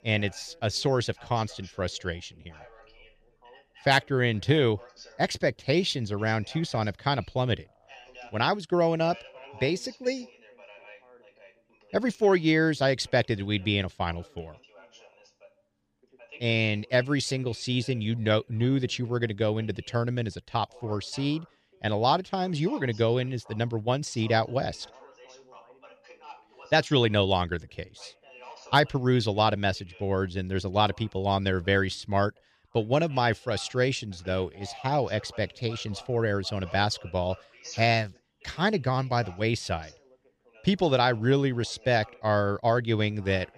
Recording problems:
background chatter; faint; throughout; 2 voices, 25 dB below the speech

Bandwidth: 14.5 kHz